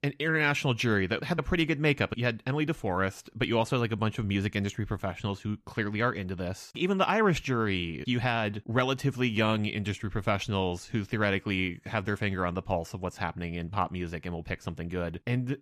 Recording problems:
none

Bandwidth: 14.5 kHz